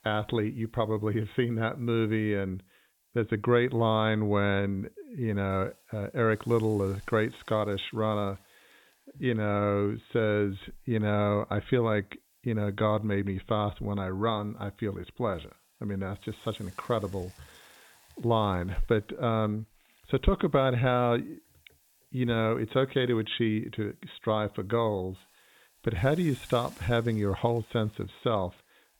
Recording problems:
high frequencies cut off; severe; nothing above 4 kHz
hiss; faint; throughout; 30 dB below the speech

